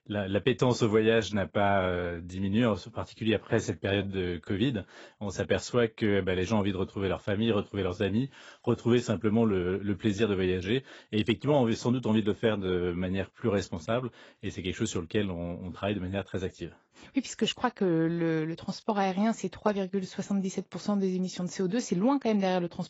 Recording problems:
garbled, watery; badly; nothing above 7.5 kHz

